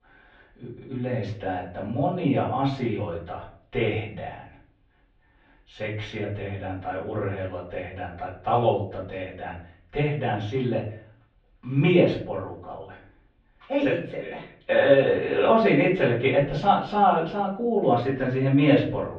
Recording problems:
off-mic speech; far
muffled; very; fading above 3.5 kHz
room echo; slight; dies away in 0.4 s

